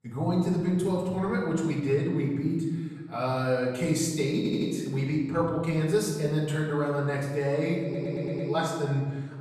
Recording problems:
off-mic speech; far
room echo; noticeable; dies away in 1.2 s
audio stuttering; at 4.5 s and at 8 s

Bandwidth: 14 kHz